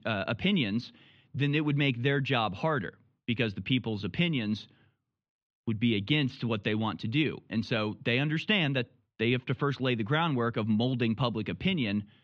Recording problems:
muffled; slightly; fading above 3.5 kHz

